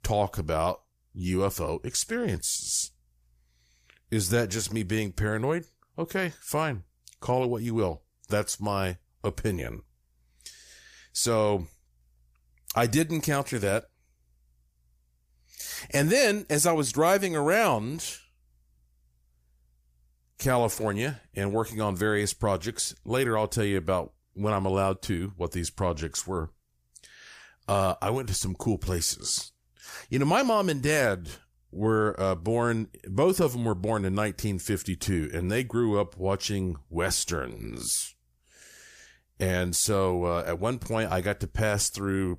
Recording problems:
none

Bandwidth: 15 kHz